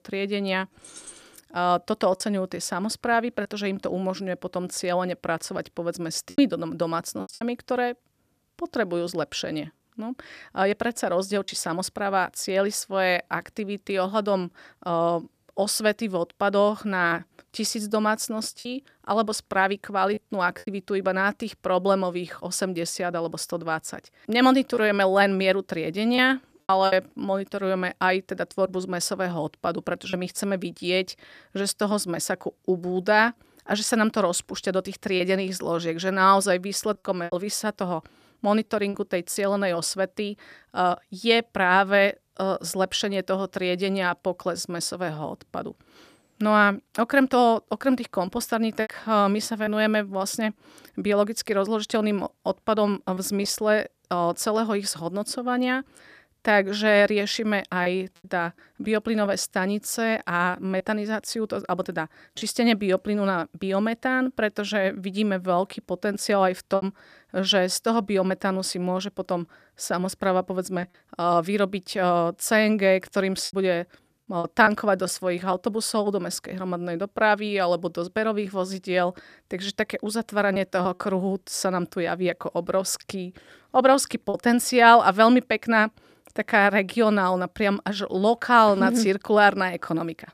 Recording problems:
choppy; occasionally; 2% of the speech affected
jangling keys; faint; at 1 s; peak 20 dB below the speech

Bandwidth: 14.5 kHz